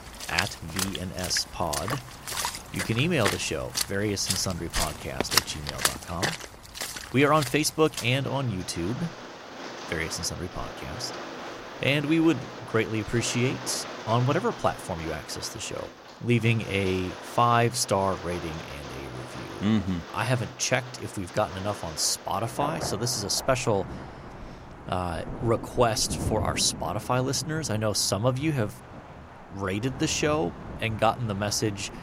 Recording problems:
rain or running water; loud; throughout; 8 dB below the speech

